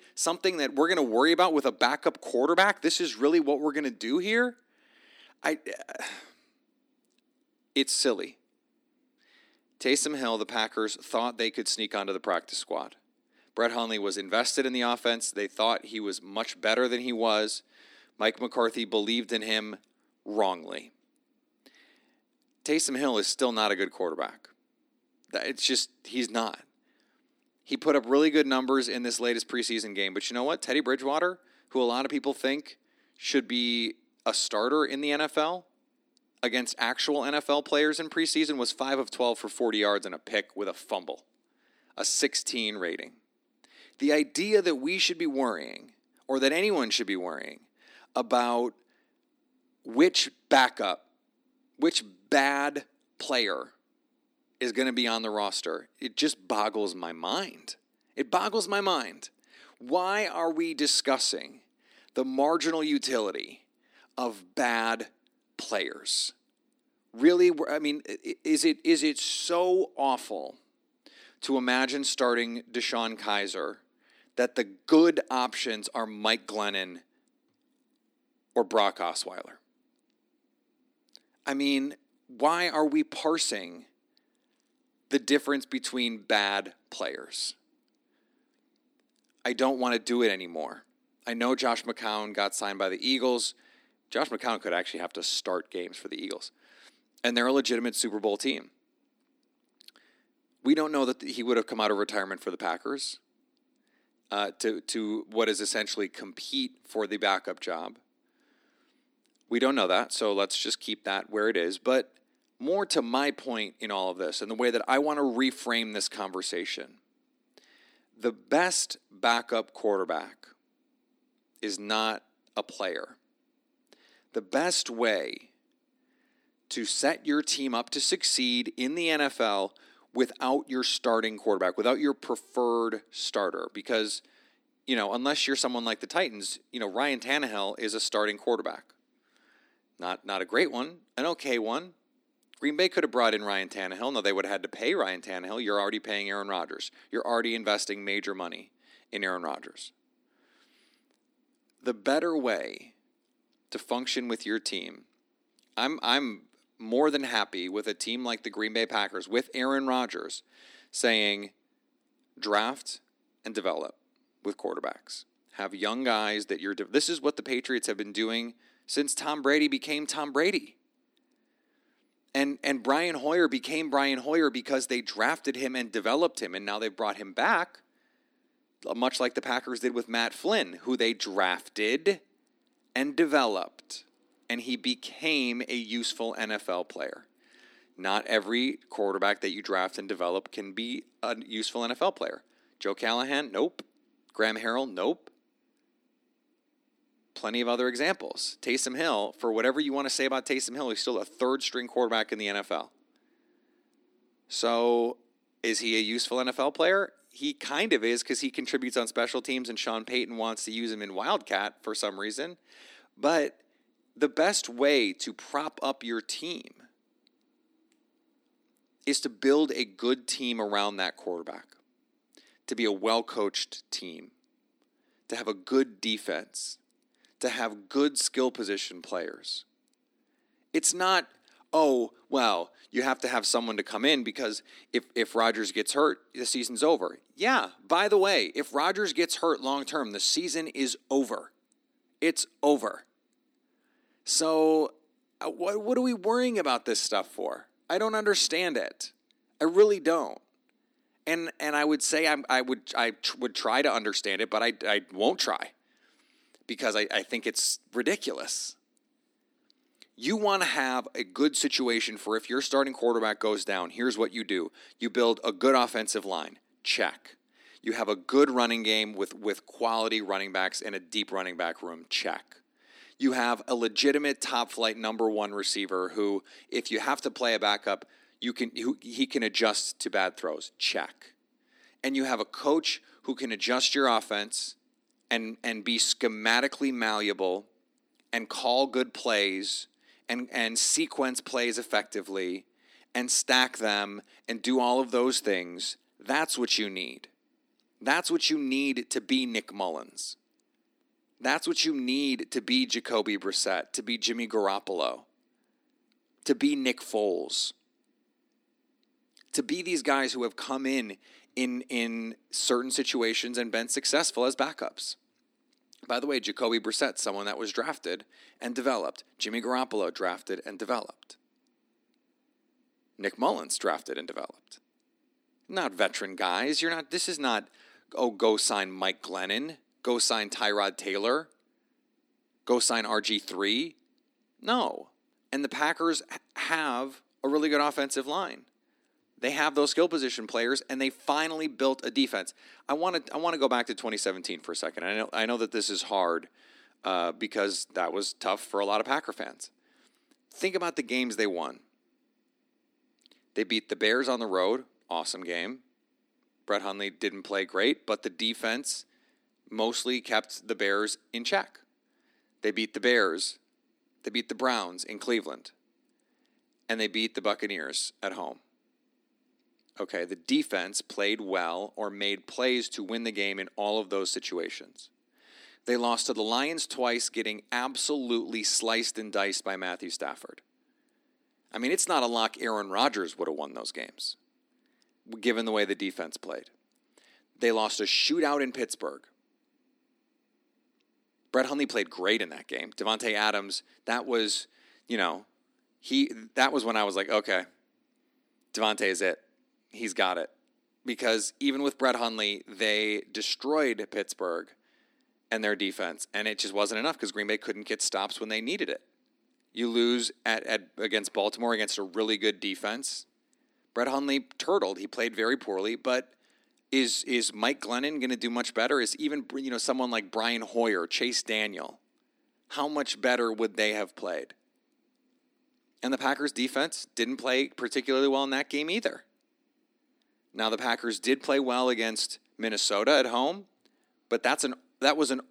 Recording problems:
thin; somewhat; fading below 250 Hz

